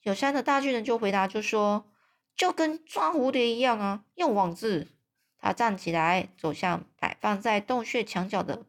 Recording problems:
none

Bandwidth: 18 kHz